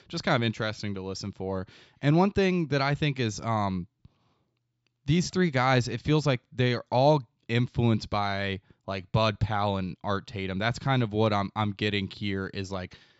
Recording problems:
high frequencies cut off; noticeable; nothing above 8 kHz

